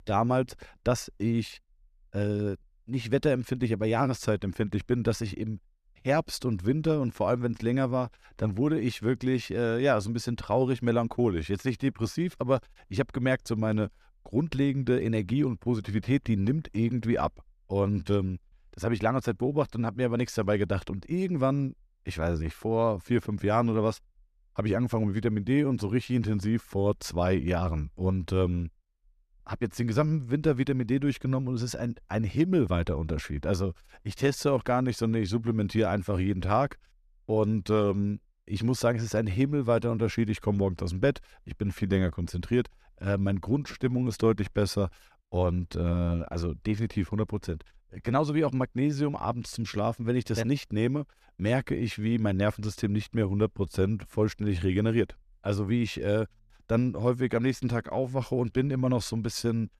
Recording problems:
none

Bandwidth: 14.5 kHz